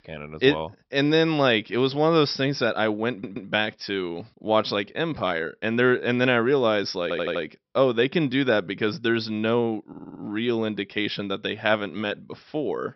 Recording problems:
high frequencies cut off; noticeable; nothing above 5.5 kHz
audio stuttering; at 3 s, at 7 s and at 10 s

